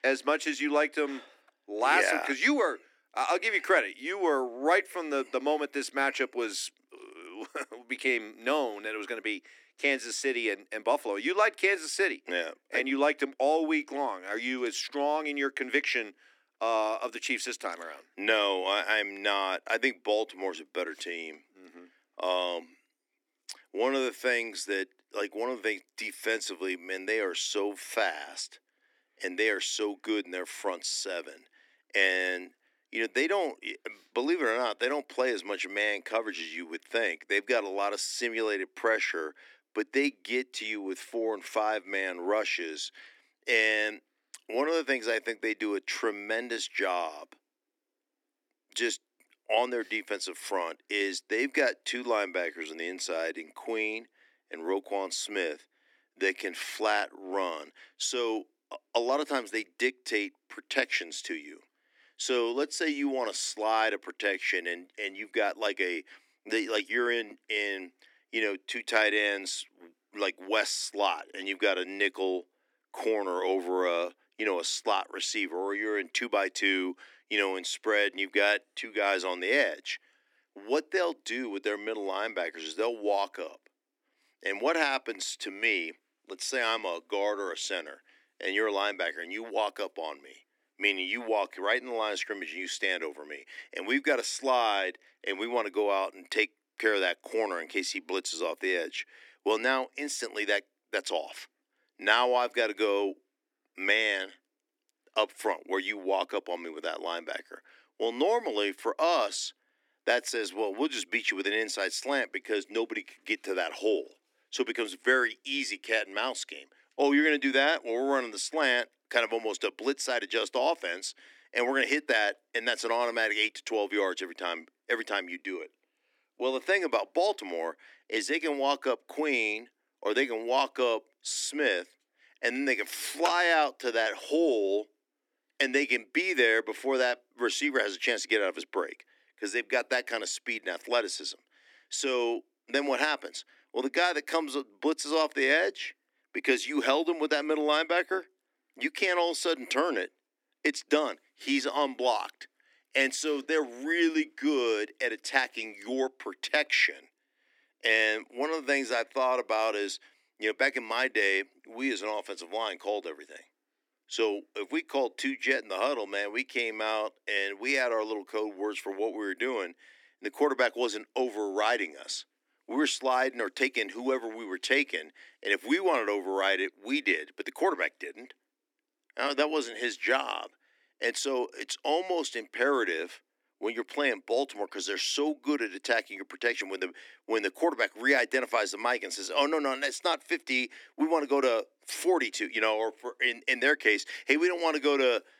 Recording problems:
thin; somewhat; fading below 250 Hz

